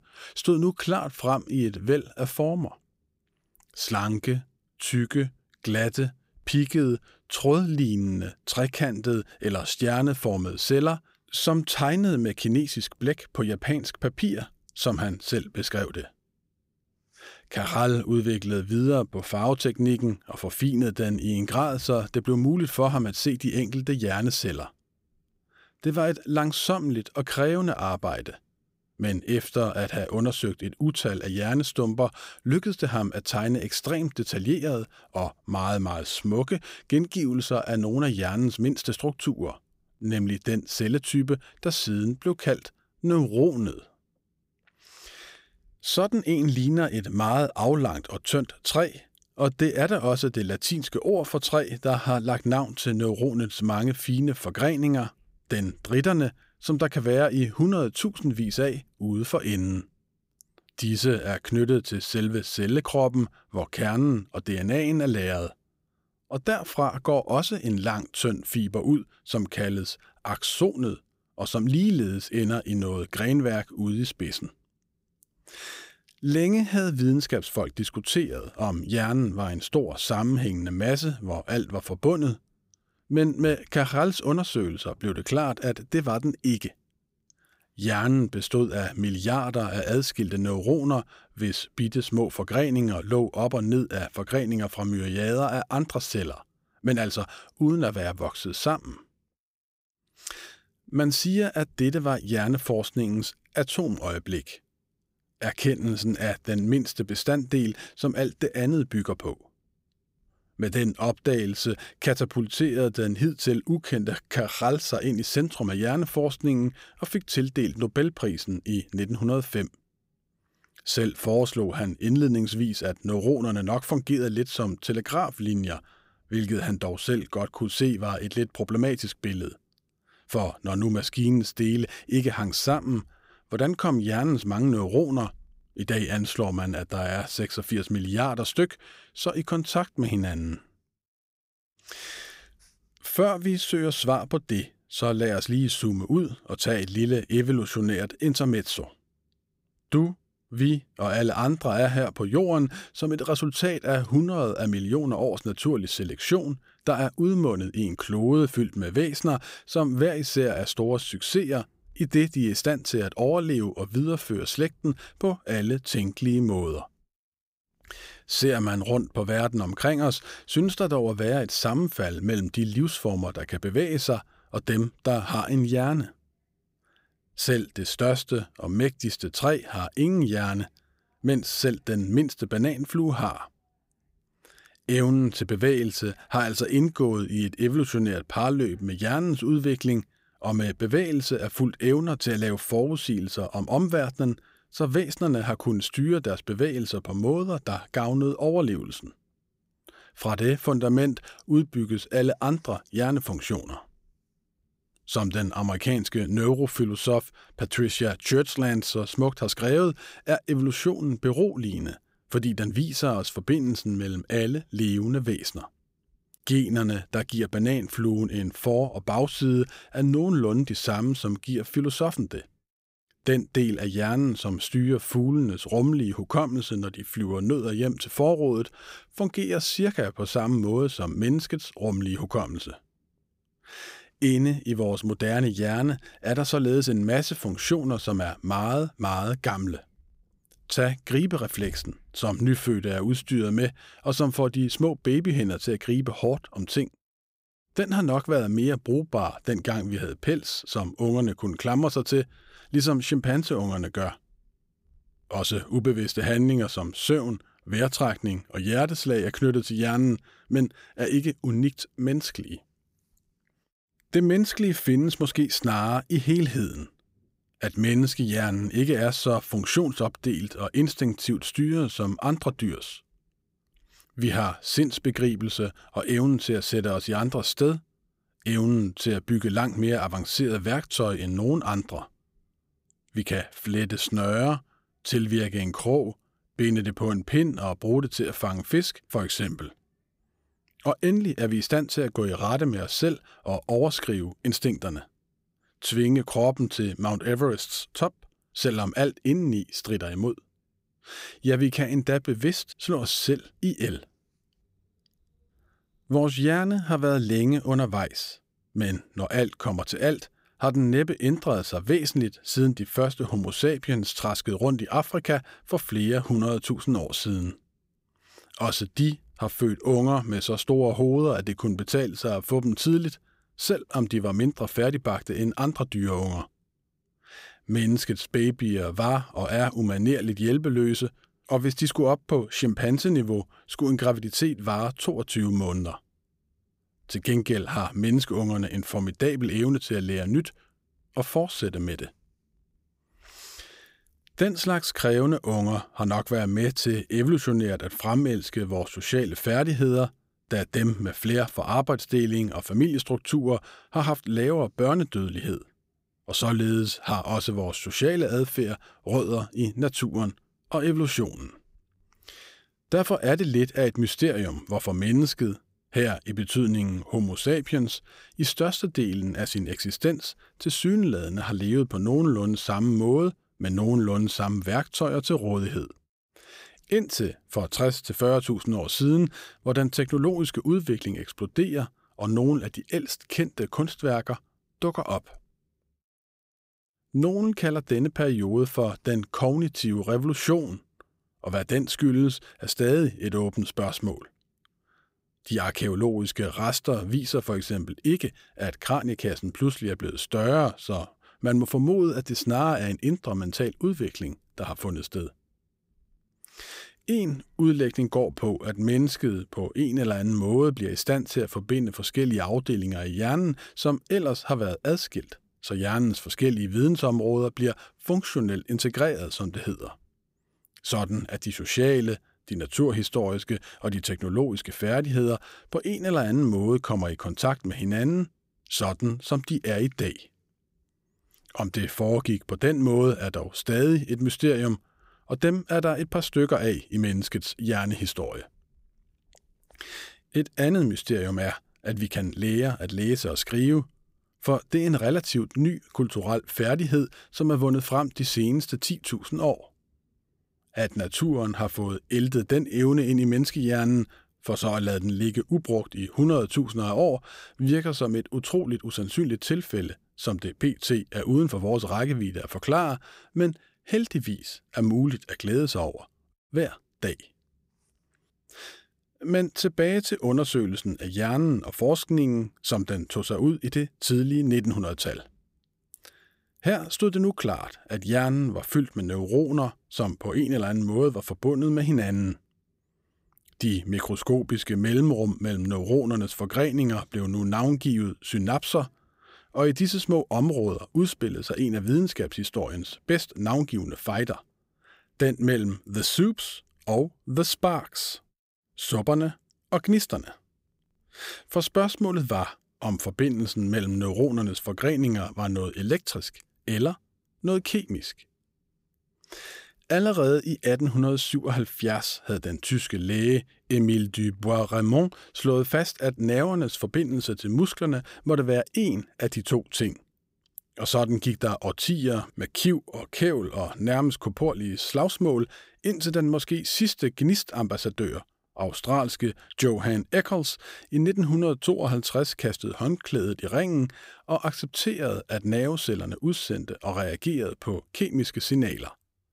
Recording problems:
none

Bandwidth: 15.5 kHz